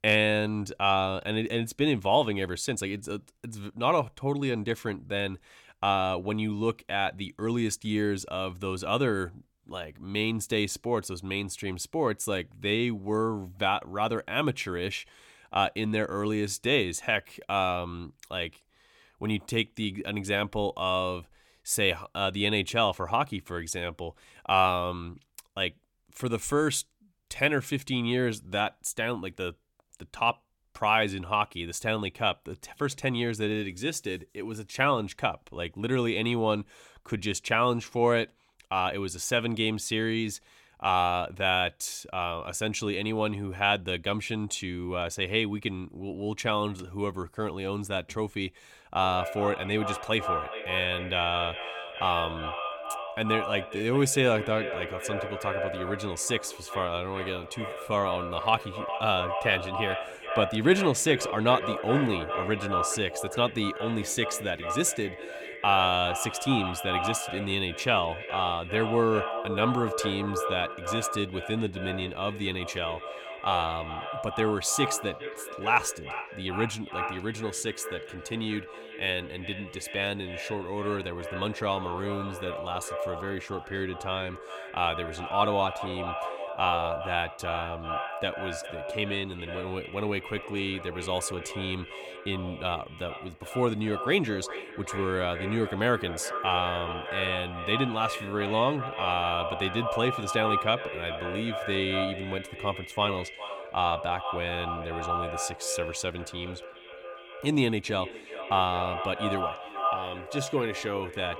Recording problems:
echo of what is said; strong; from 49 s on; 410 ms later, 7 dB below the speech

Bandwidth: 17.5 kHz